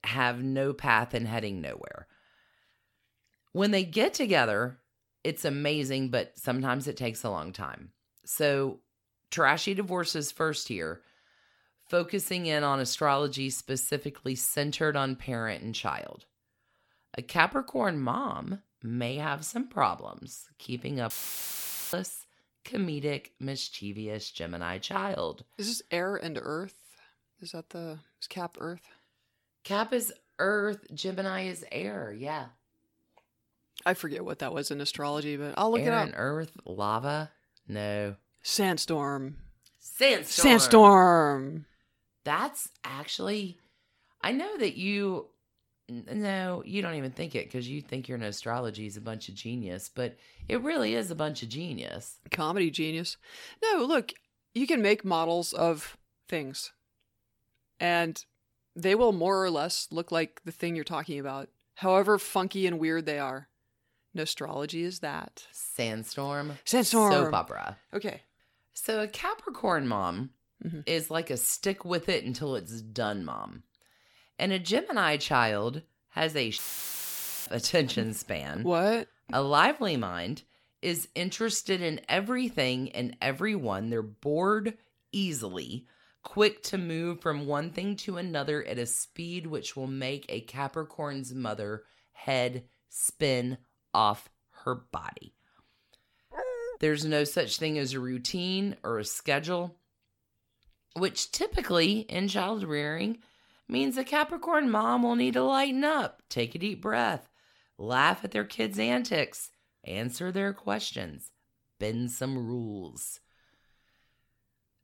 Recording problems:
audio cutting out; filled with static; at 21 s for 1 s and at 1:17 for 1 s
dog barking; noticeable; at 1:36; peak 6 dB below the speech

